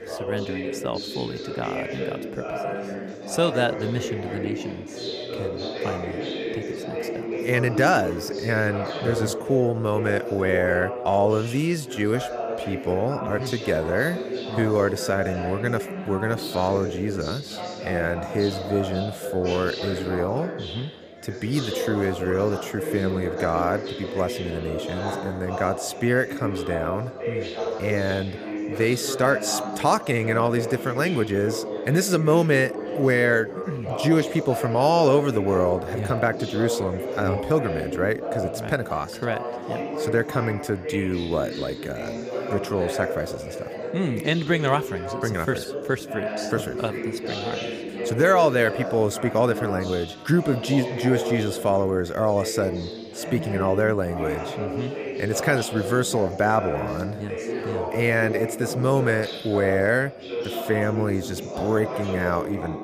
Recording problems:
chatter from many people; loud; throughout; 6 dB below the speech

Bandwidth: 15 kHz